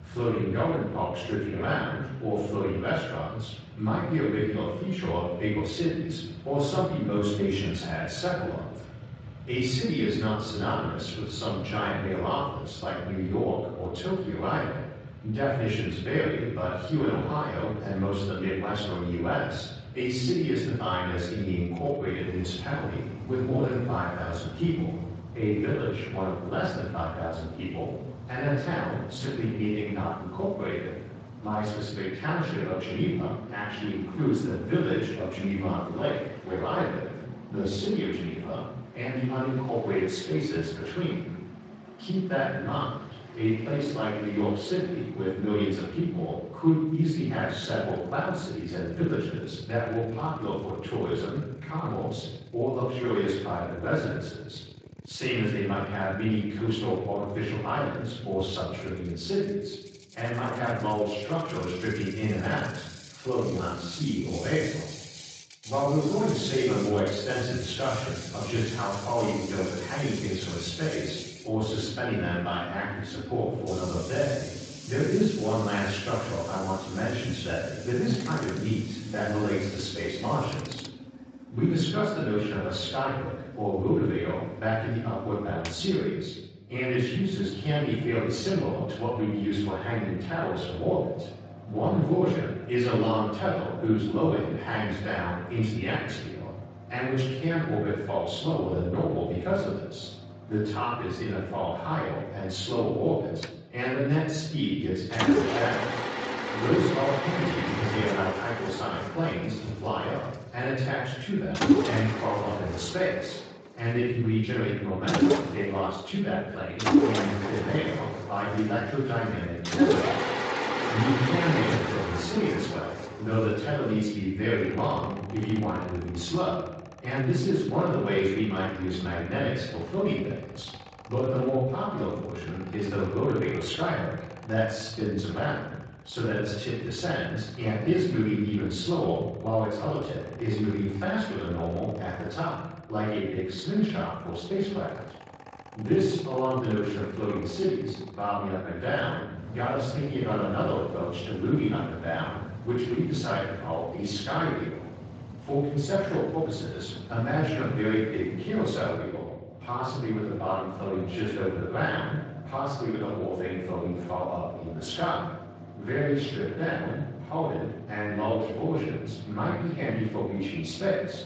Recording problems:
off-mic speech; far
room echo; noticeable; dies away in 1 s
garbled, watery; slightly; nothing above 7.5 kHz
machinery noise; loud; throughout; 8 dB below the speech

